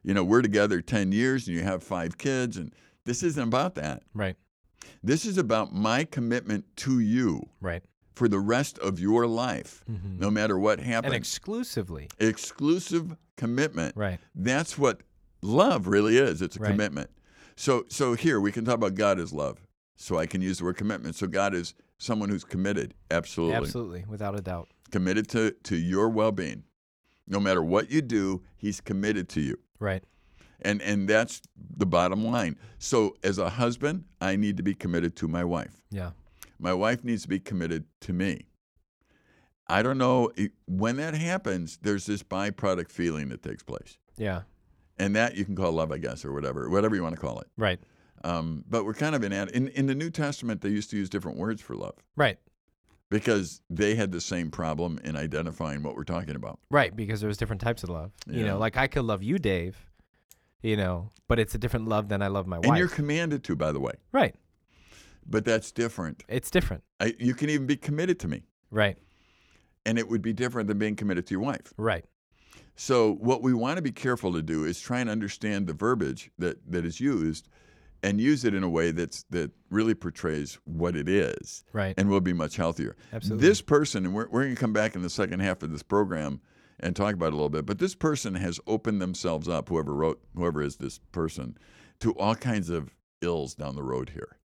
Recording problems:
none

